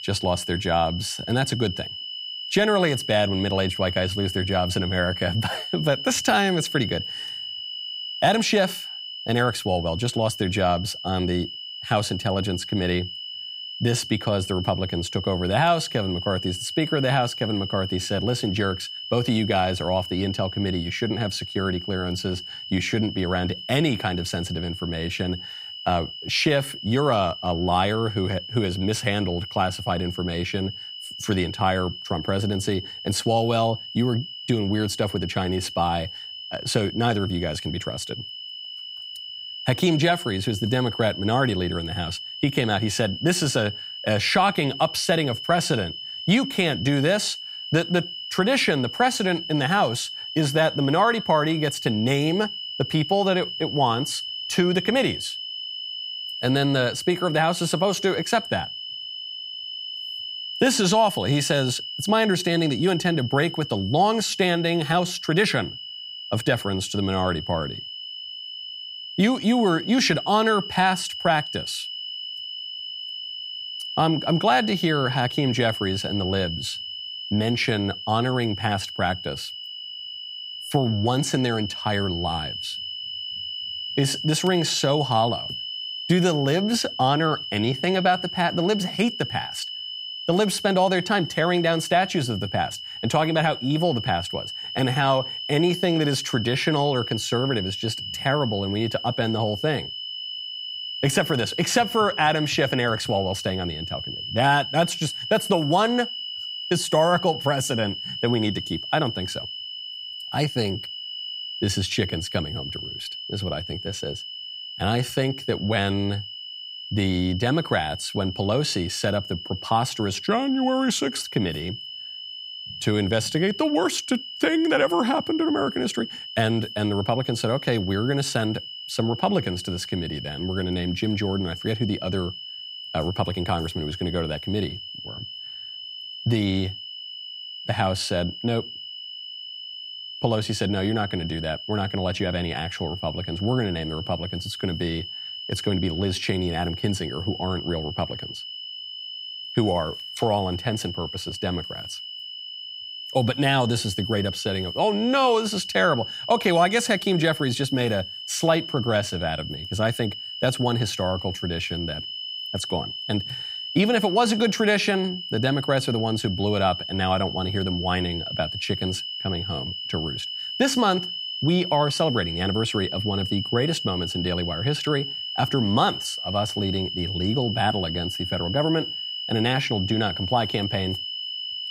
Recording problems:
high-pitched whine; loud; throughout; 3 kHz, 7 dB below the speech

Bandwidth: 15.5 kHz